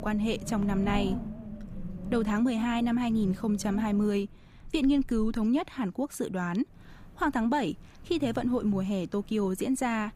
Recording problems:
wind noise on the microphone; occasional gusts; 15 dB below the speech

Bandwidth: 15 kHz